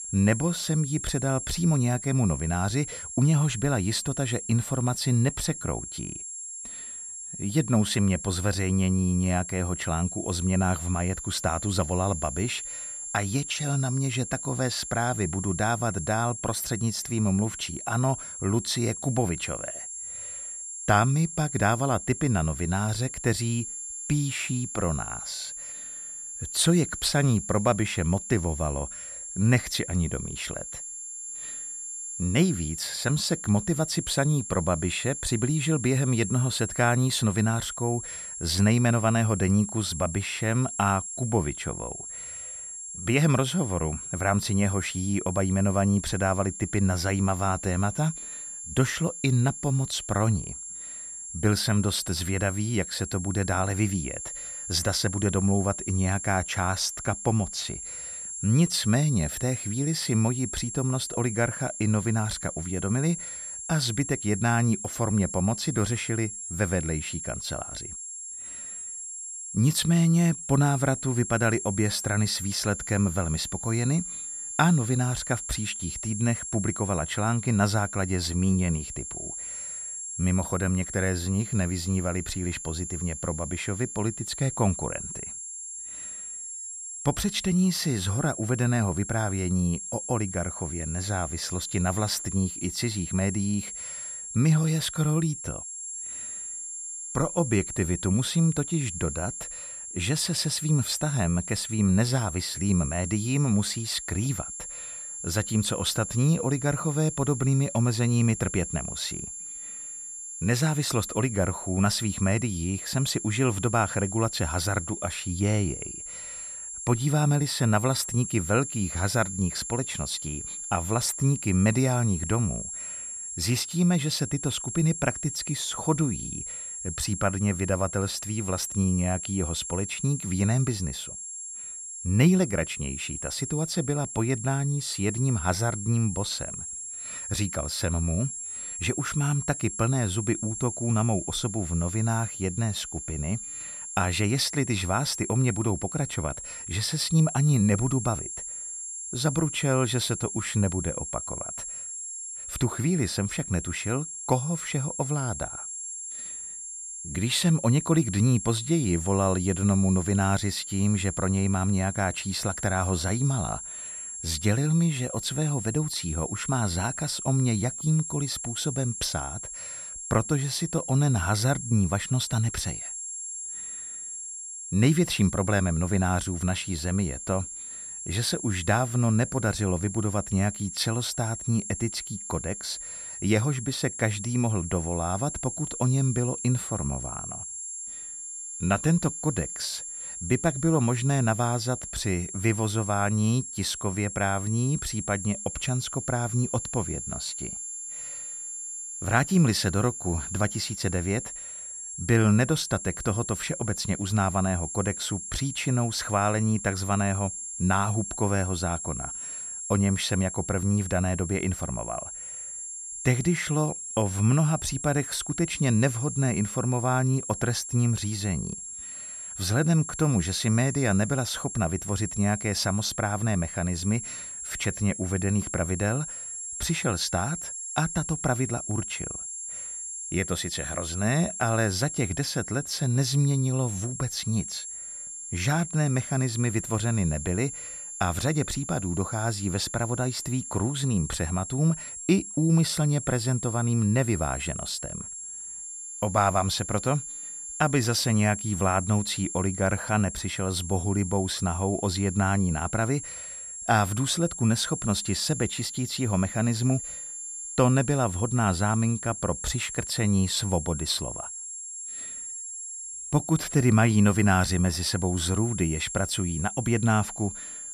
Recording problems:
high-pitched whine; loud; throughout; 7.5 kHz, 7 dB below the speech

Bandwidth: 14.5 kHz